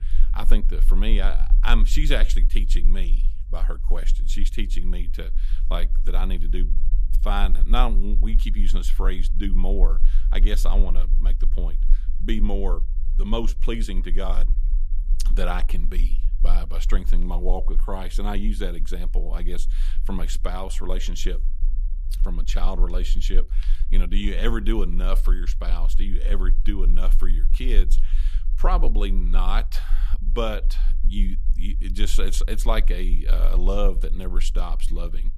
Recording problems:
low rumble; noticeable; throughout; 20 dB below the speech

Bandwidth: 14.5 kHz